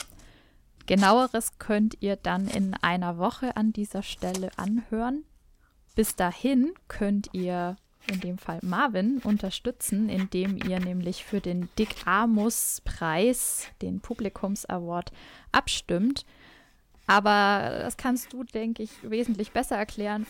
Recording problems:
household noises; noticeable; throughout; 20 dB below the speech

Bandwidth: 16.5 kHz